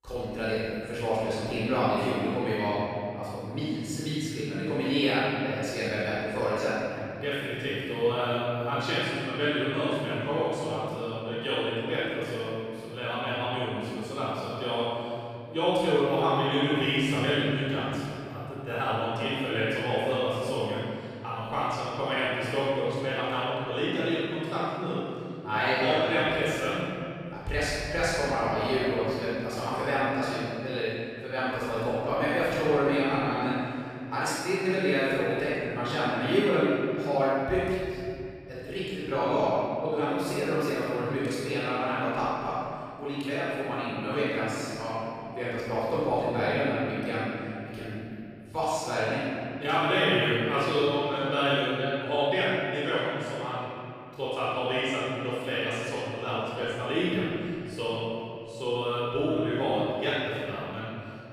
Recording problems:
room echo; strong; dies away in 2.4 s
off-mic speech; far

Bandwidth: 15 kHz